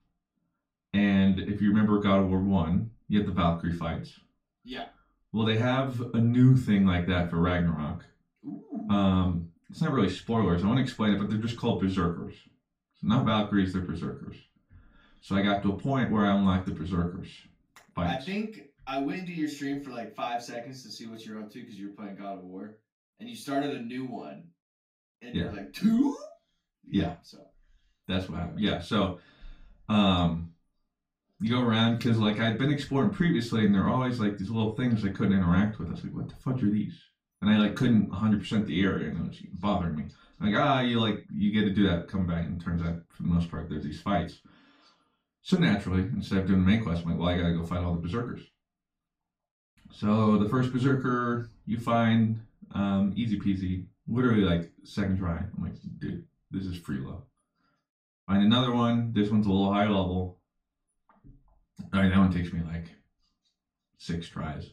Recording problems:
off-mic speech; far
room echo; slight; dies away in 0.2 s

